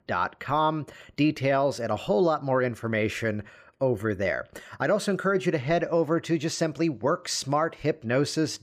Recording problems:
none

